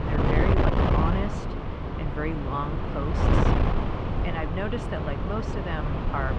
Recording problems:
muffled; slightly; fading above 3 kHz
wind noise on the microphone; heavy; 2 dB above the speech
murmuring crowd; very faint; throughout; 25 dB below the speech
abrupt cut into speech; at the start

